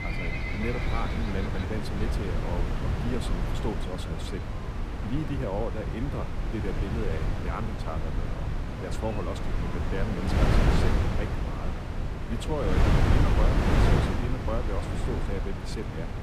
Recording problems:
wind noise on the microphone; heavy; 2 dB above the speech
animal sounds; loud; until 12 s; 7 dB below the speech

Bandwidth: 15 kHz